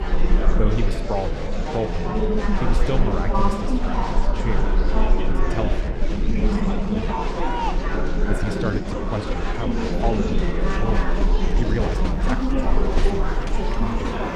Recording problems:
murmuring crowd; very loud; throughout; 4 dB above the speech
animal sounds; noticeable; throughout; 15 dB below the speech
low rumble; faint; throughout; 20 dB below the speech
uneven, jittery; strongly; from 6 to 12 s

